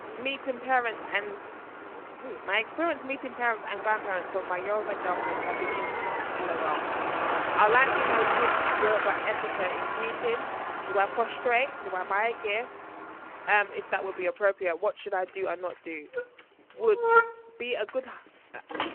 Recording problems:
phone-call audio
traffic noise; loud; throughout; 1 dB below the speech

